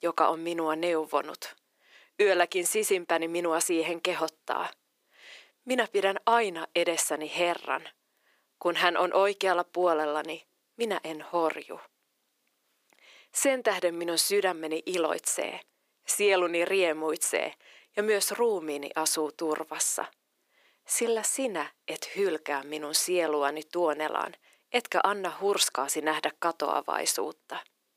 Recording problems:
thin; very; fading below 350 Hz

